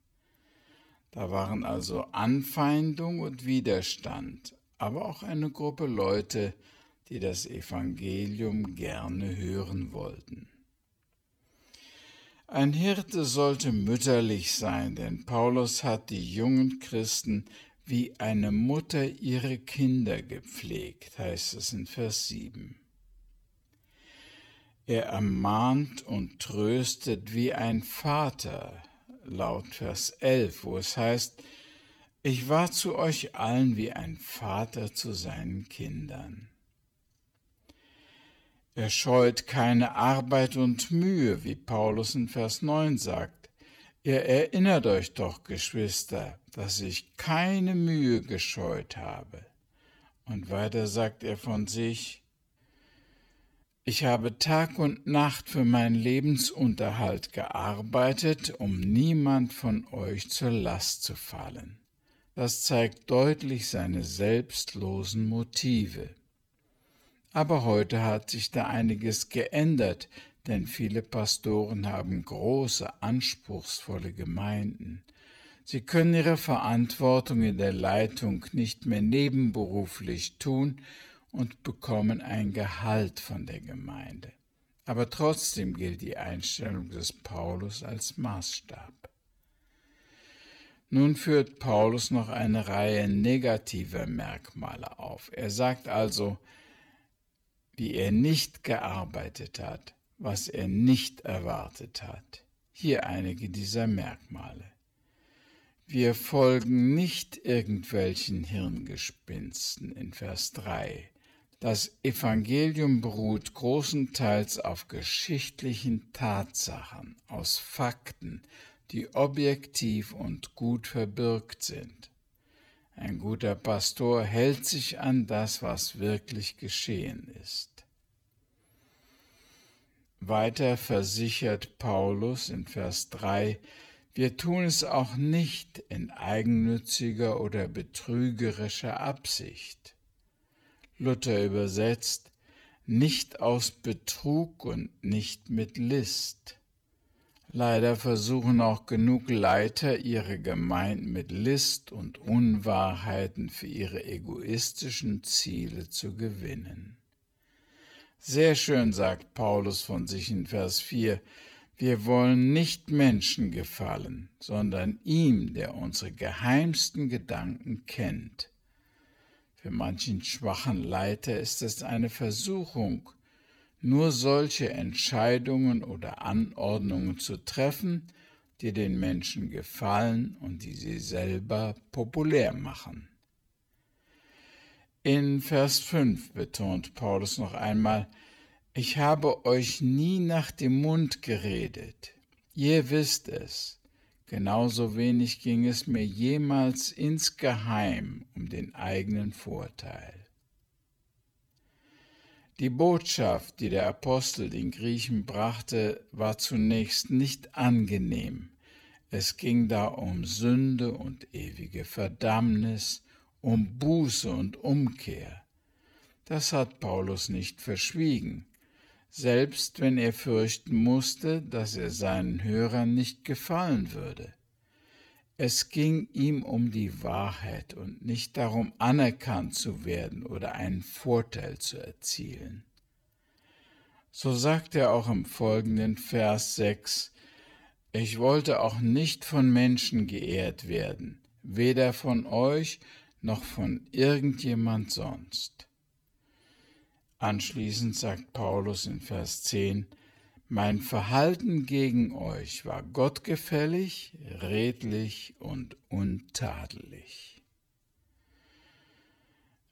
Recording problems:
wrong speed, natural pitch; too slow; 0.7 times normal speed

